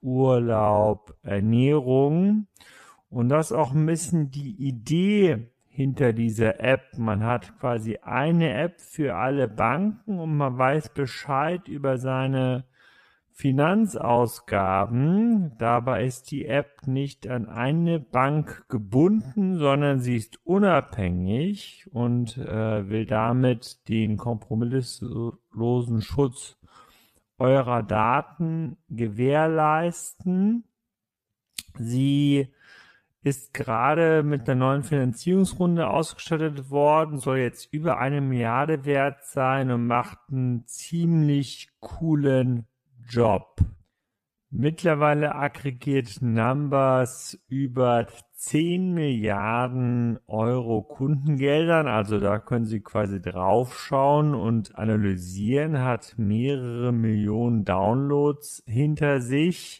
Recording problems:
wrong speed, natural pitch; too slow; 0.6 times normal speed

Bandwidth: 14.5 kHz